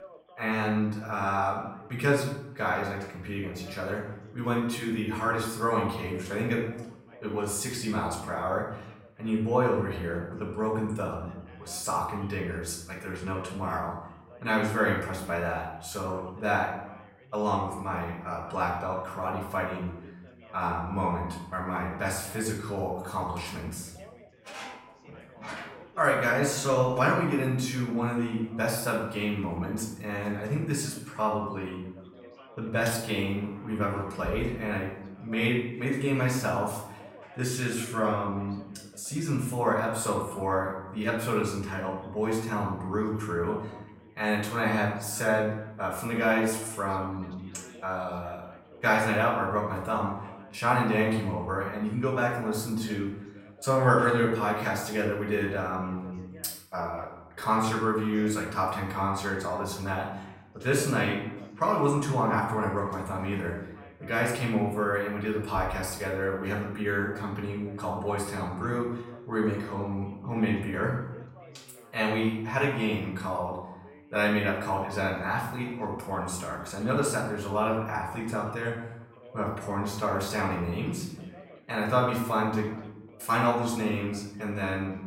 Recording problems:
off-mic speech; far
room echo; noticeable; dies away in 0.7 s
echo of what is said; faint; from 18 s on; 110 ms later, 25 dB below the speech
background chatter; faint; throughout; 3 voices, 25 dB below the speech

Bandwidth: 16 kHz